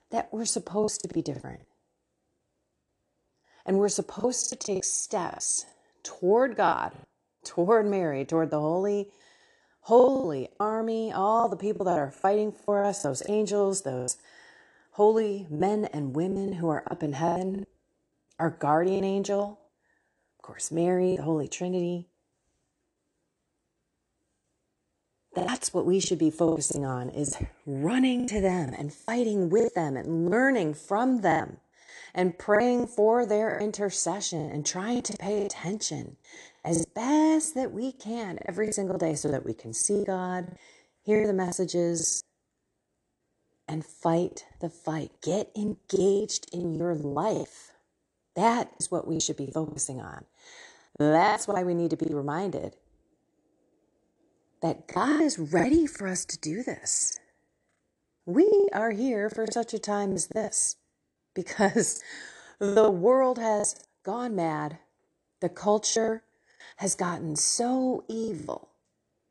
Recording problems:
choppy; very; 11% of the speech affected

